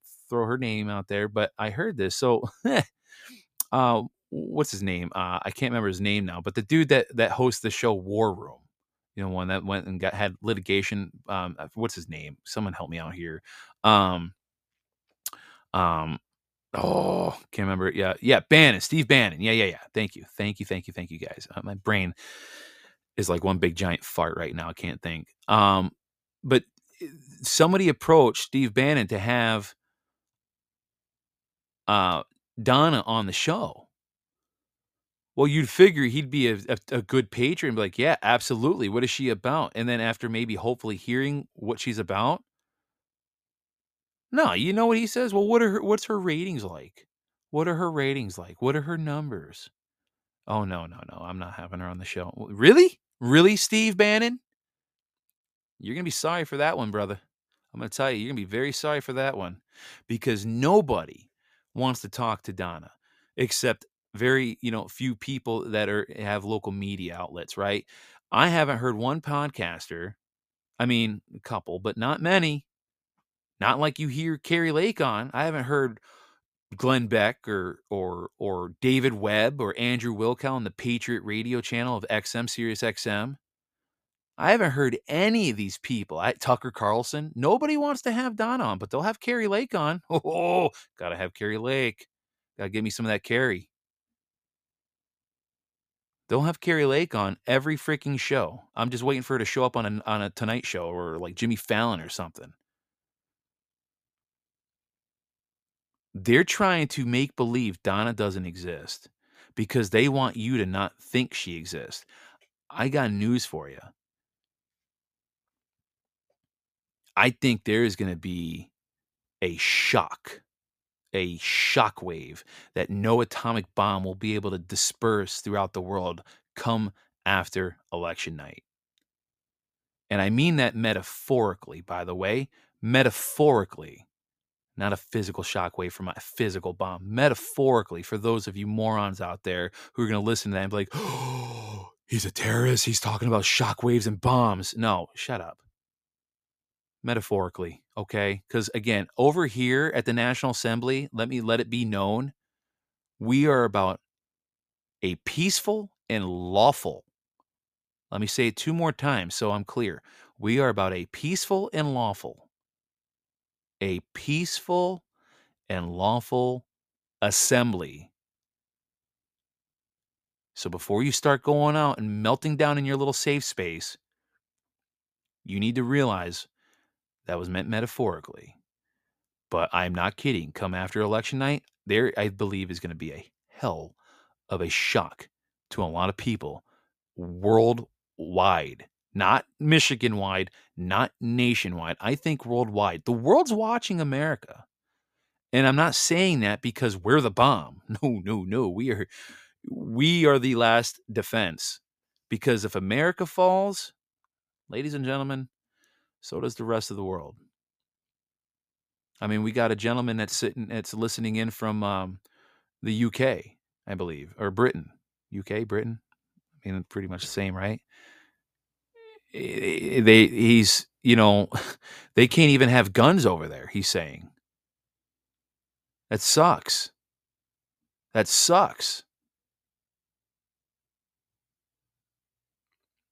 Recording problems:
none

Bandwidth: 15 kHz